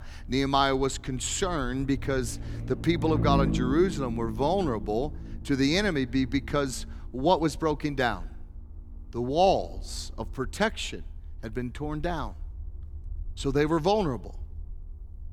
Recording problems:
low rumble; noticeable; throughout; 15 dB below the speech

